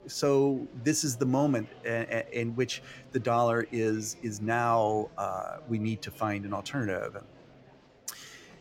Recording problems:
murmuring crowd; faint; throughout; 25 dB below the speech

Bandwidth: 16 kHz